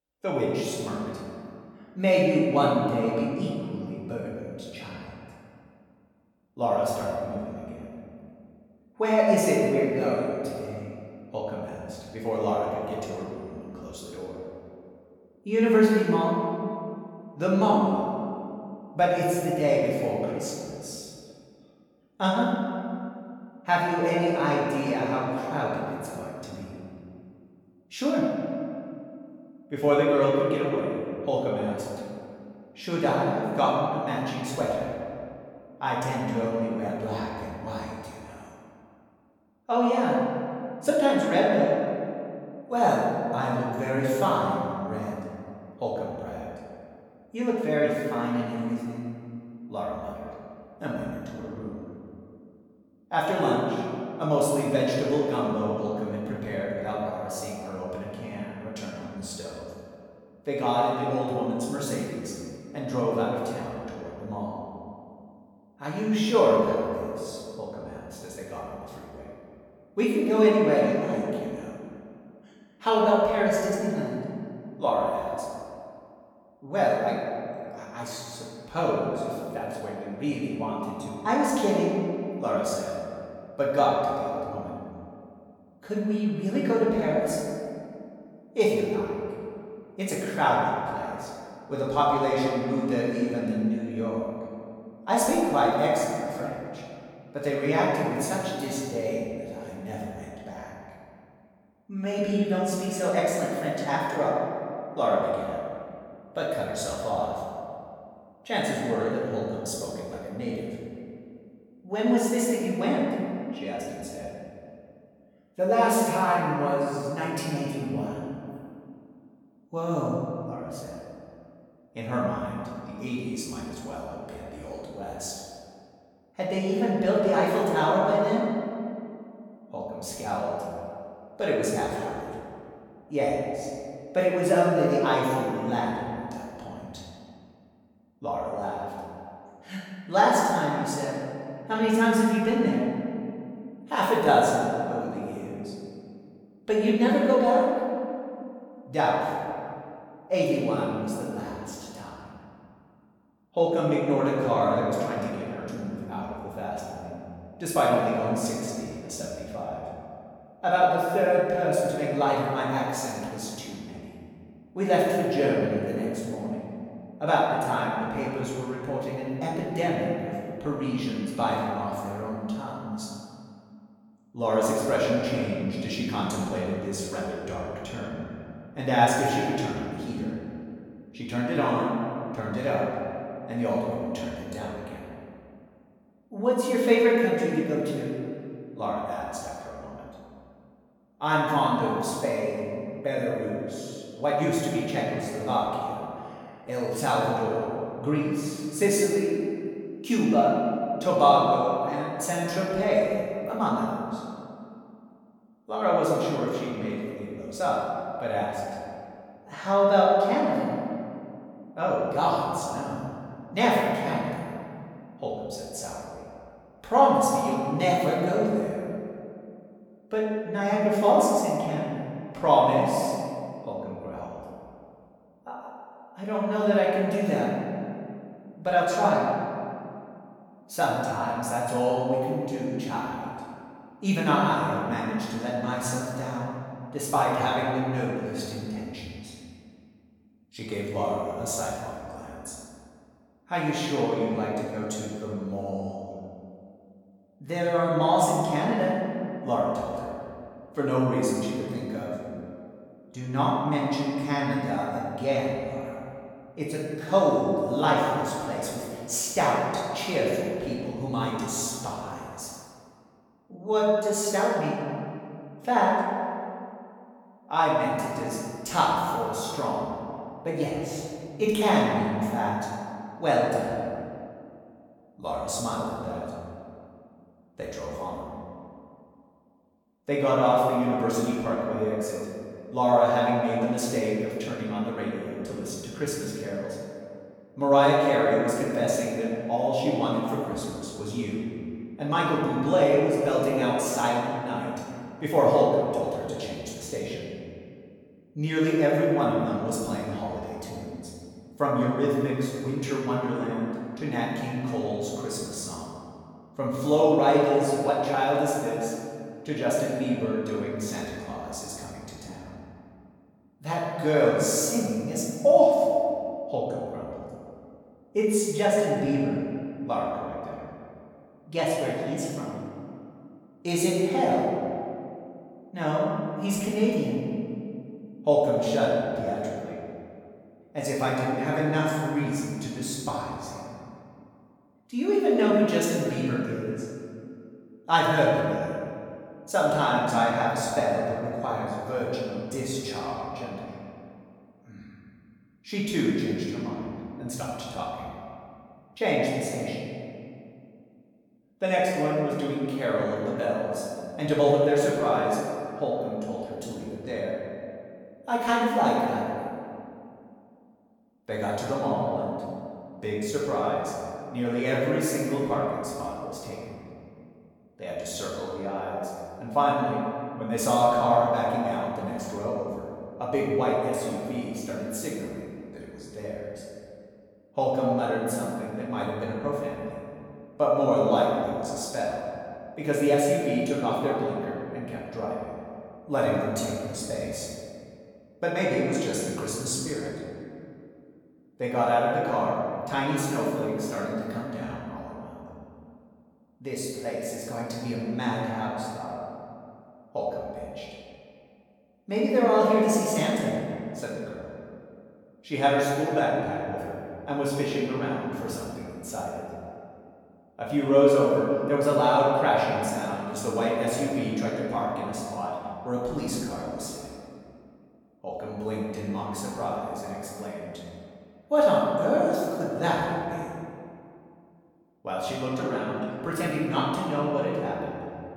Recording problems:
room echo; strong; dies away in 2.2 s
off-mic speech; far

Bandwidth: 18.5 kHz